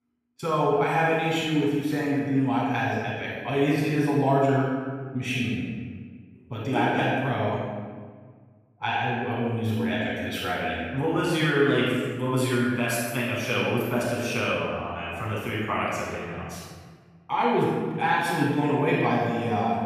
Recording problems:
room echo; strong; dies away in 1.5 s
off-mic speech; far

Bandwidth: 14.5 kHz